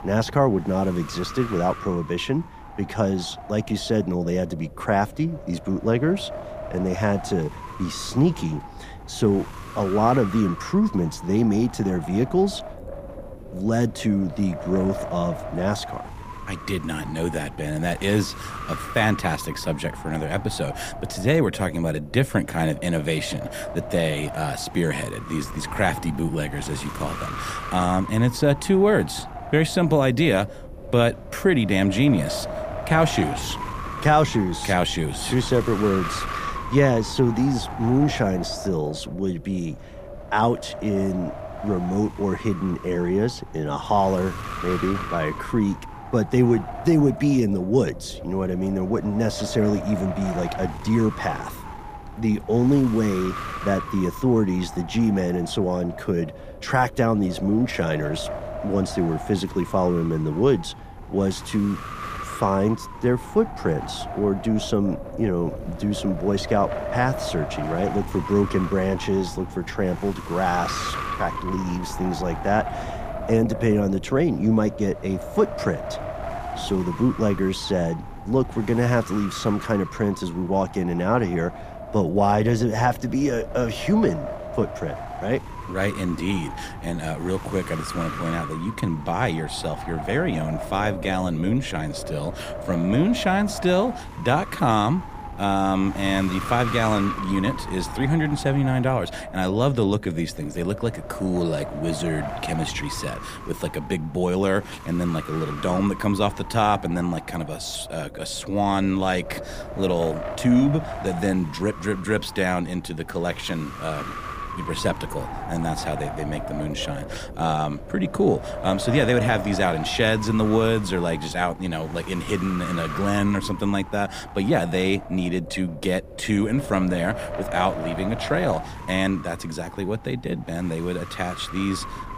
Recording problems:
wind noise on the microphone; heavy; 8 dB below the speech

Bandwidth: 15 kHz